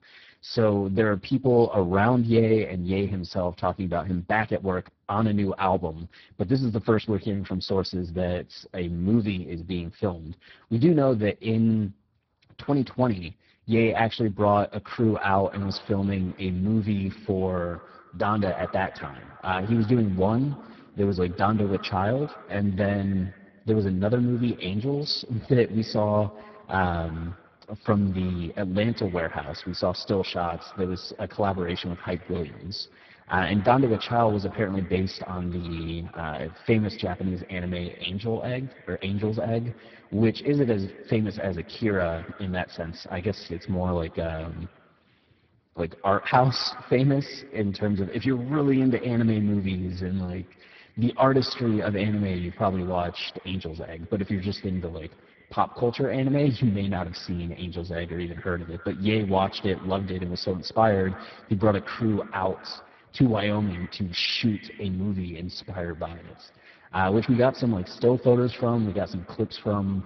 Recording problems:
garbled, watery; badly
high frequencies cut off; noticeable; nothing above 5 kHz
echo of what is said; faint; from 15 s on; 100 ms later, 20 dB below the speech

